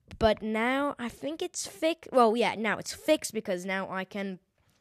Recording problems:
none

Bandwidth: 14.5 kHz